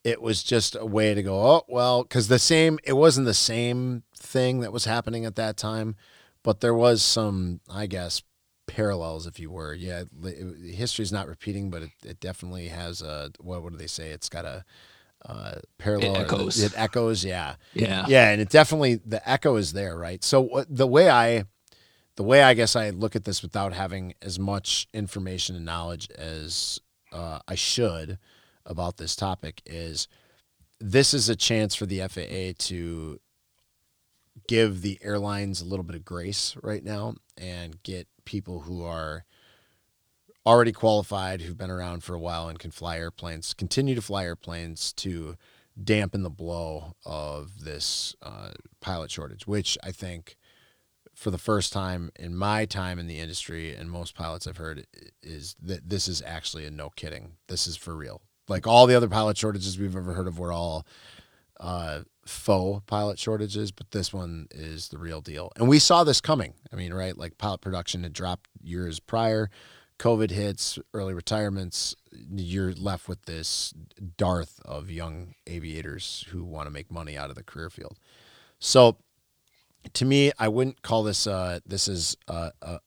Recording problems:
none

